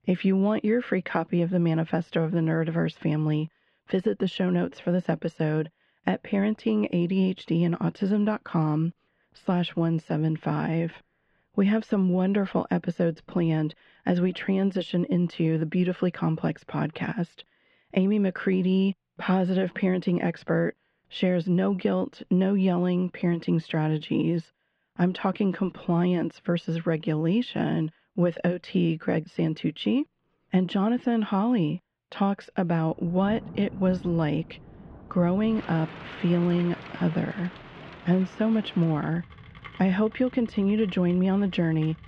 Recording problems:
muffled; very; fading above 3 kHz
rain or running water; noticeable; from 33 s on; 15 dB below the speech

